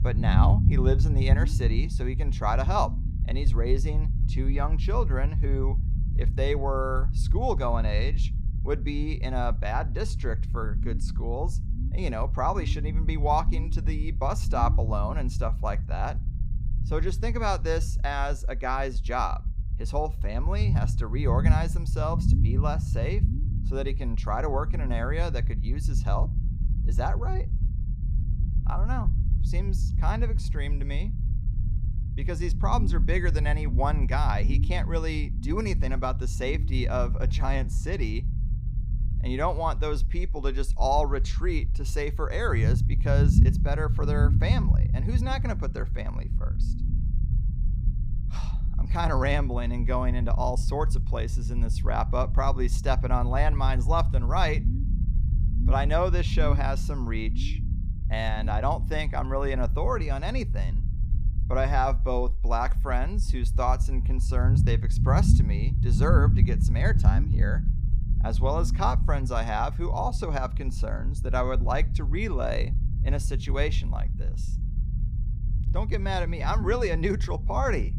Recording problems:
low rumble; noticeable; throughout; 10 dB below the speech

